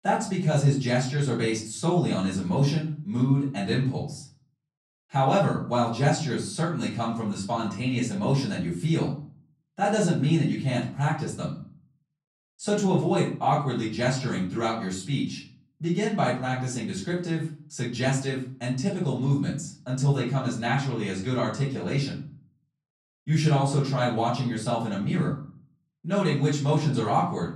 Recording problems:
off-mic speech; far
room echo; slight; dies away in 0.4 s

